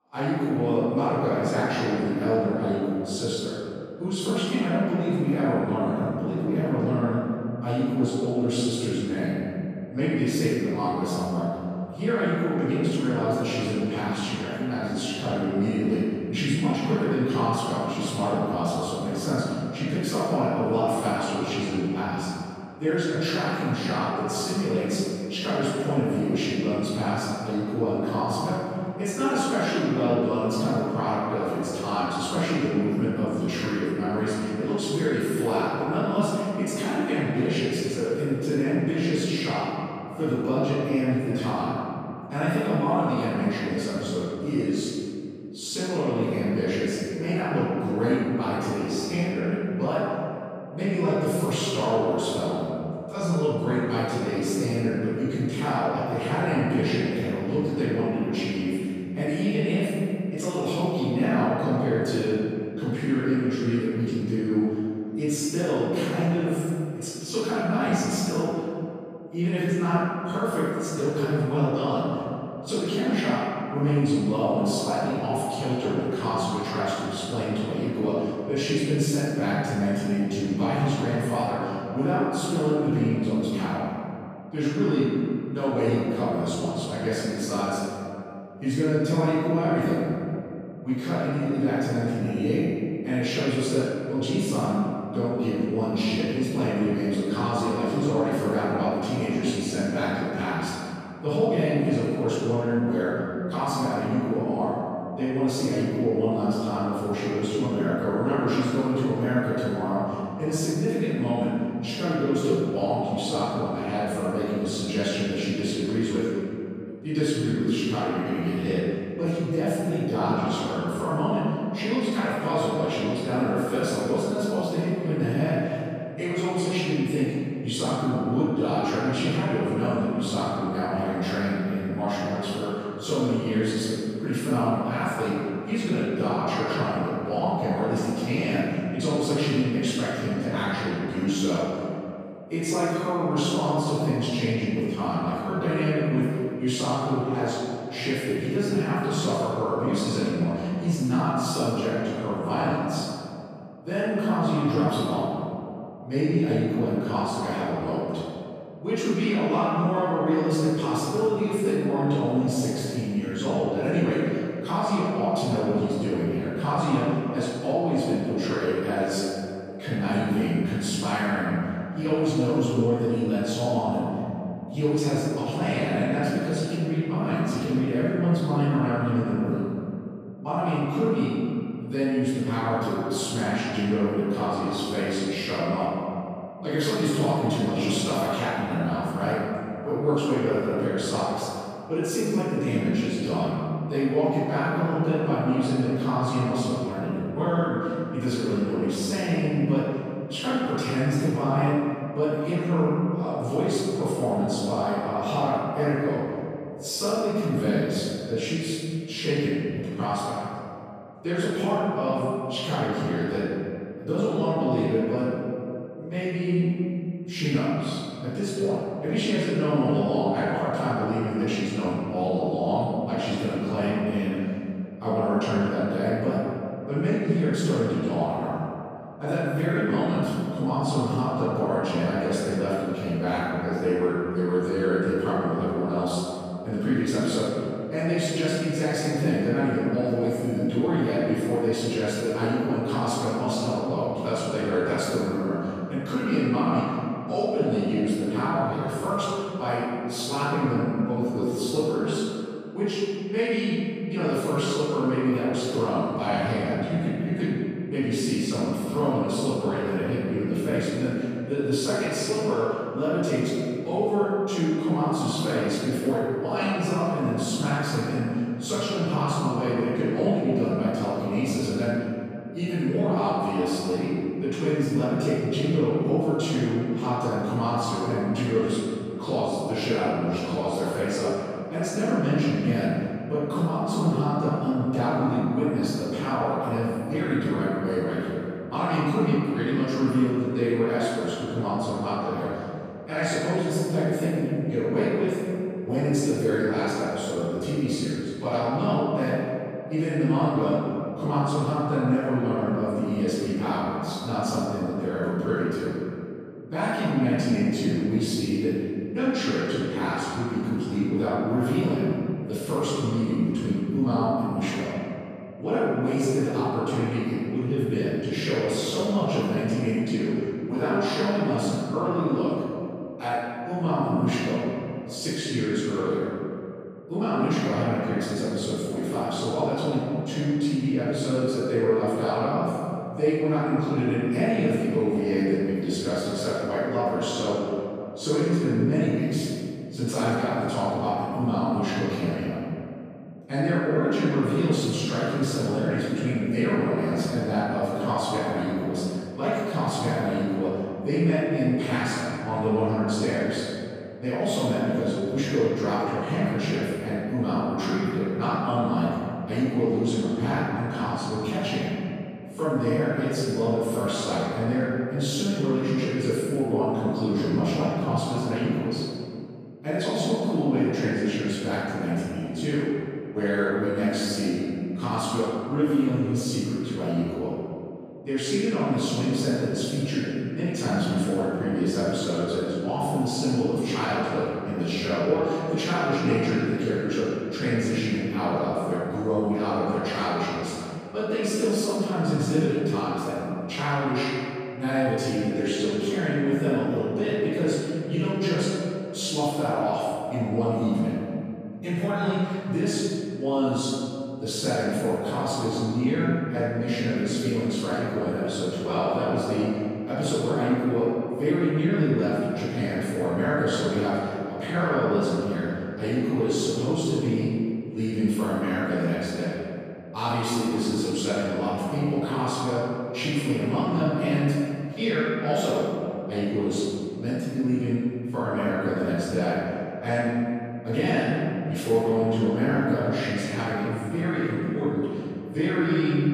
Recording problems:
room echo; strong; dies away in 2.5 s
off-mic speech; far

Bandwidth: 14.5 kHz